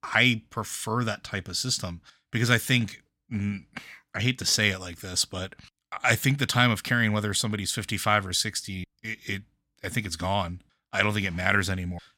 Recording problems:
none

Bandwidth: 16.5 kHz